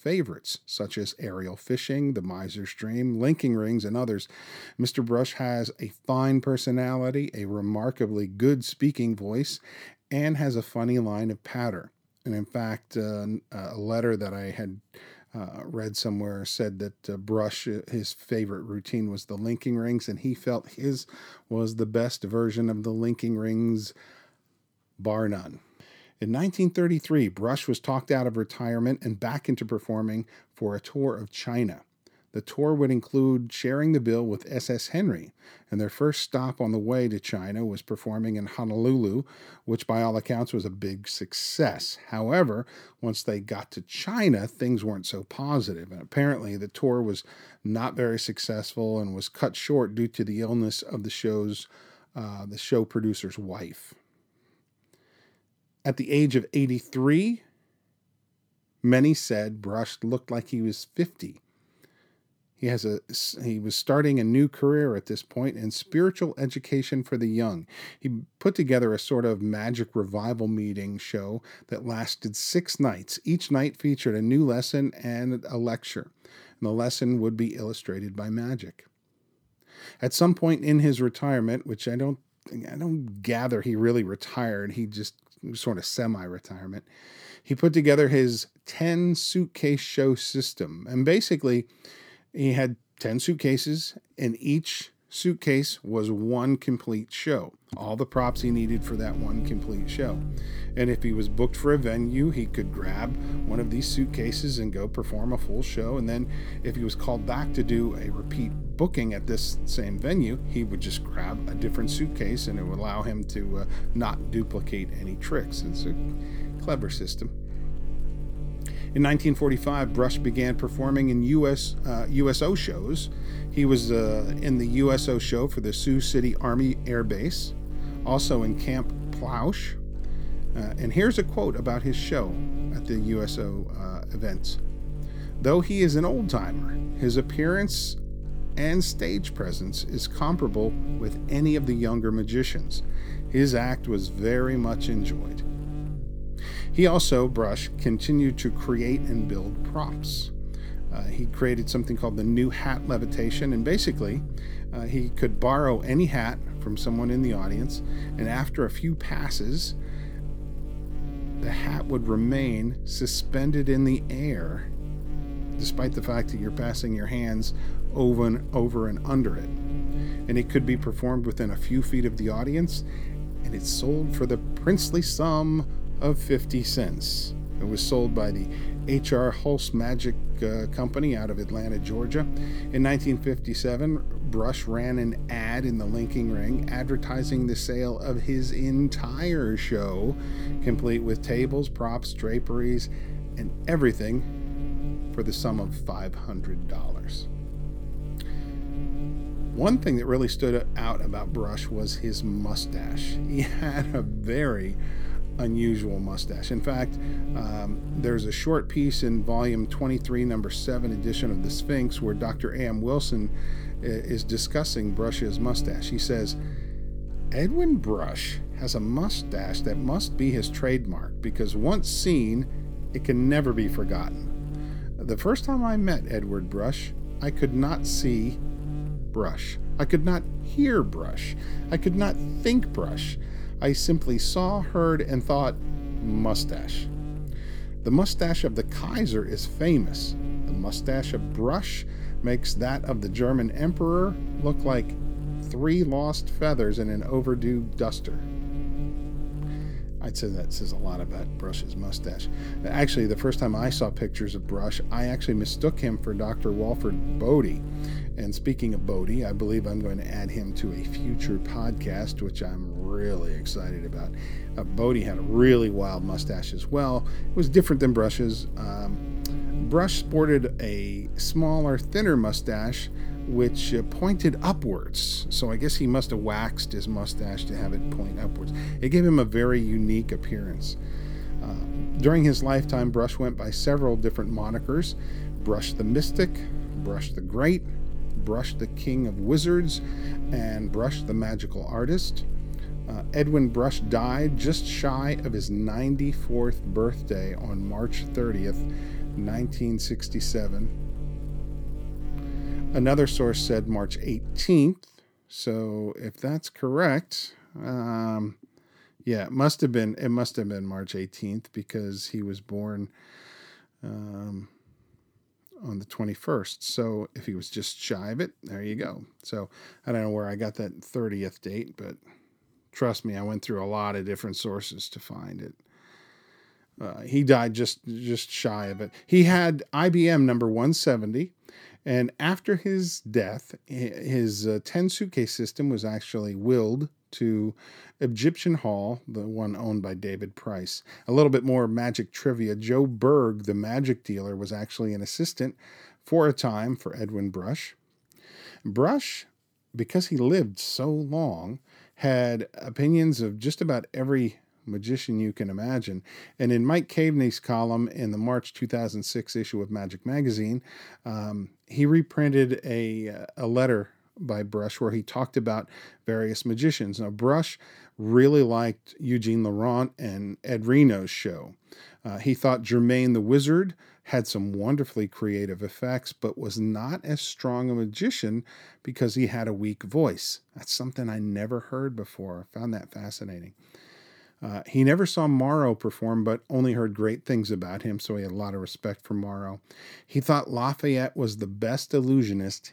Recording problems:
electrical hum; noticeable; from 1:38 to 5:04; 50 Hz, 15 dB below the speech

